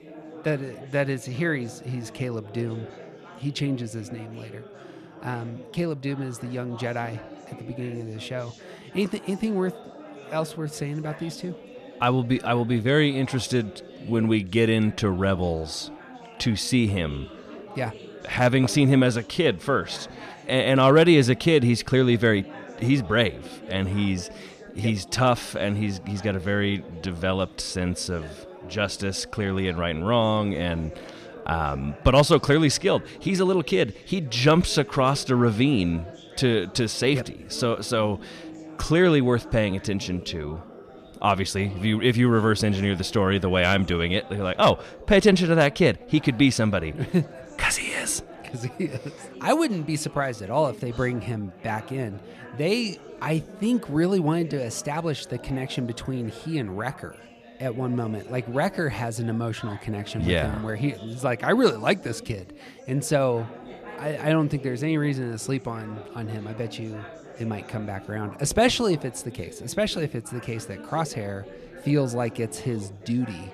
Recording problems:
chatter from many people; noticeable; throughout; 20 dB below the speech

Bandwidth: 14.5 kHz